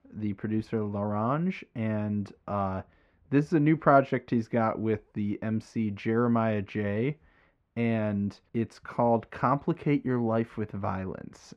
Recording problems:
muffled; very; fading above 2 kHz

